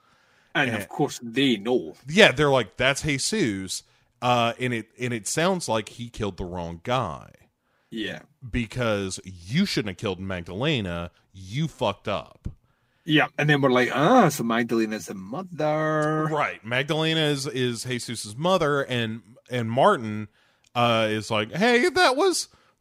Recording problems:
none

